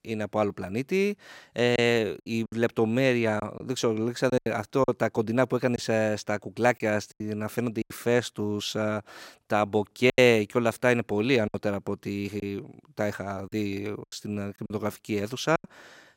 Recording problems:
choppy; very; 7% of the speech affected

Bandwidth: 16 kHz